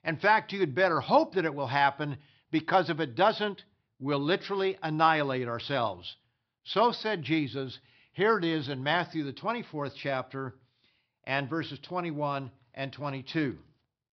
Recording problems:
high frequencies cut off; noticeable; nothing above 5.5 kHz

